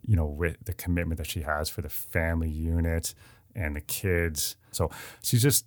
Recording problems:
none

